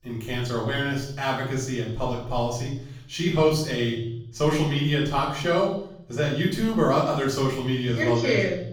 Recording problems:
off-mic speech; far
room echo; noticeable; dies away in 0.7 s

